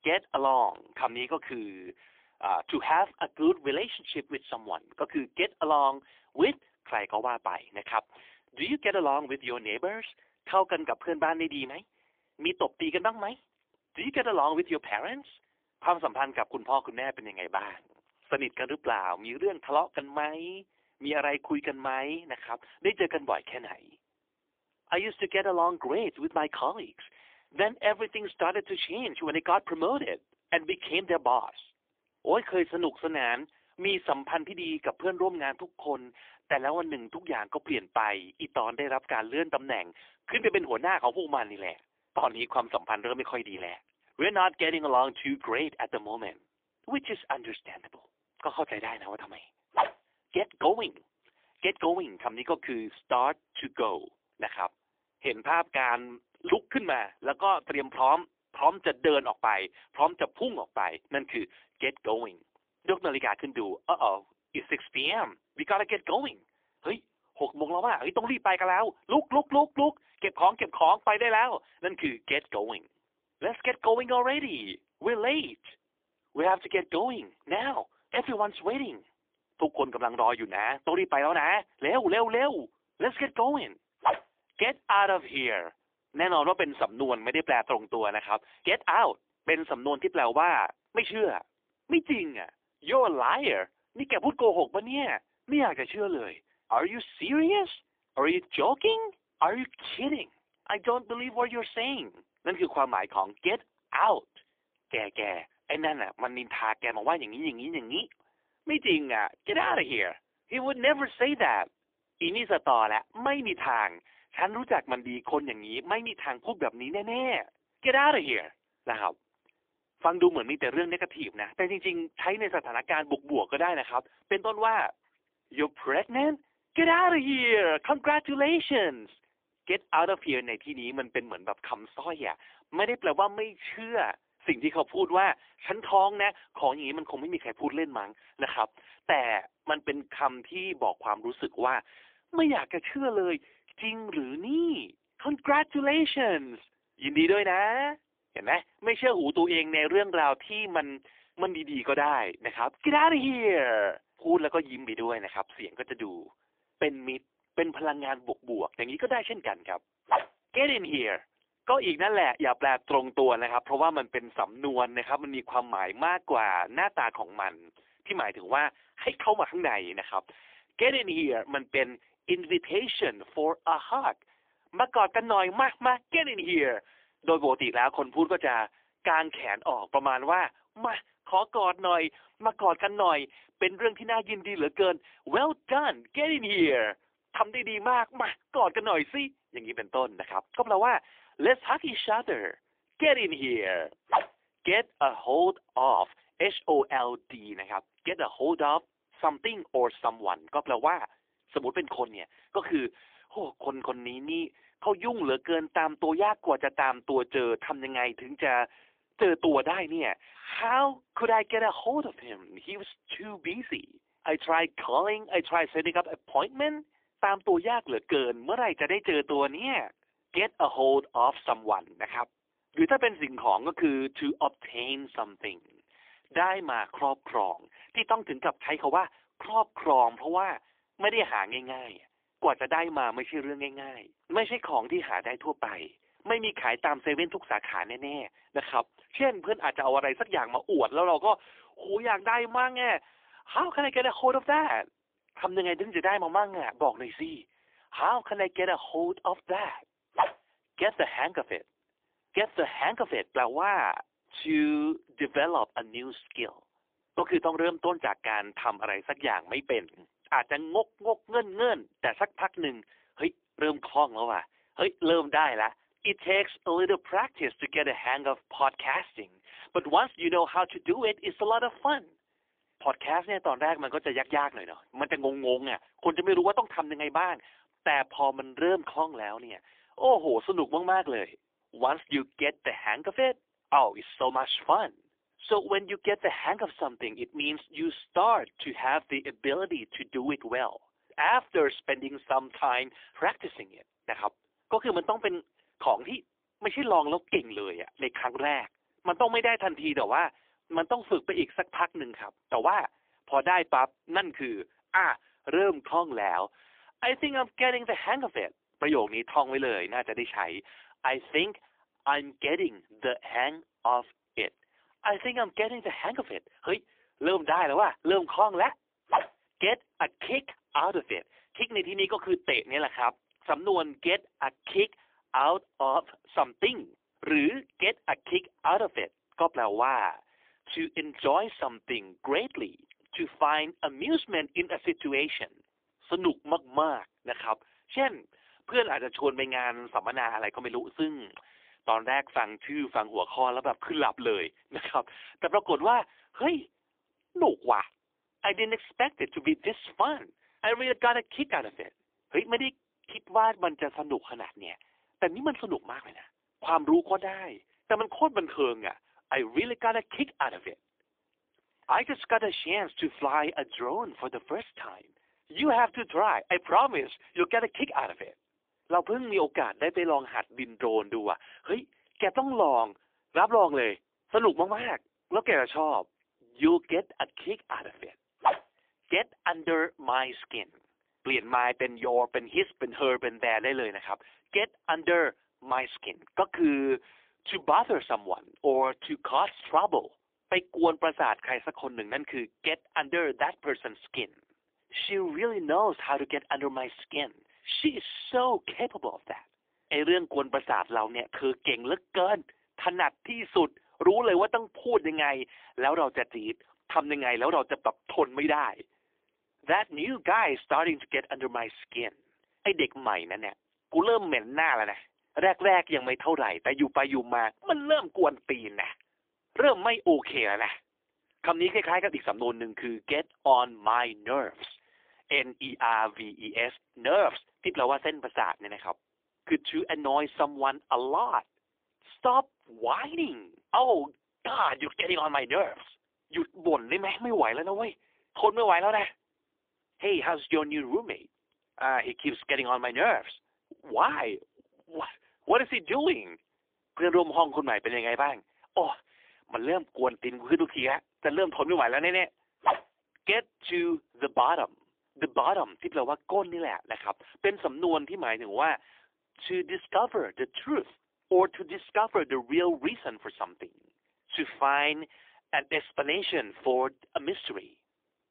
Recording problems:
phone-call audio; poor line; nothing above 3.5 kHz

